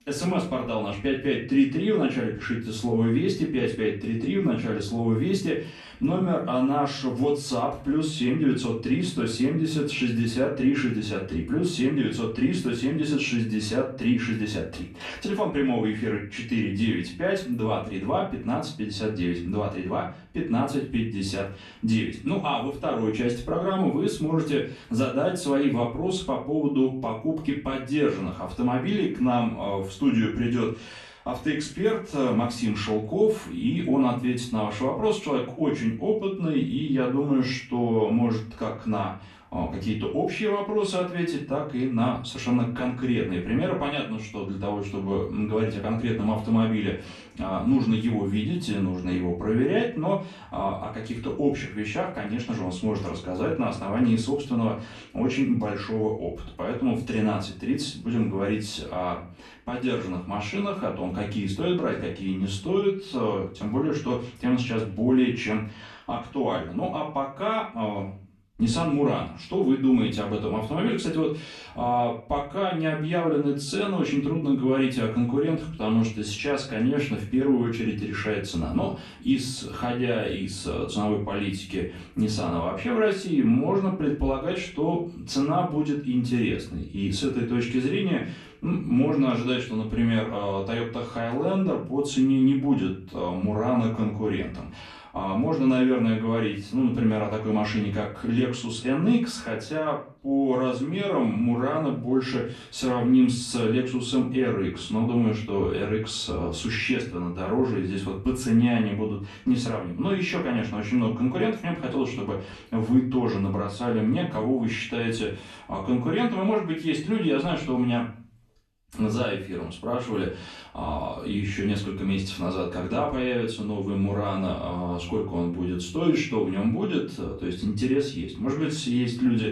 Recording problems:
off-mic speech; far
room echo; slight; dies away in 0.4 s

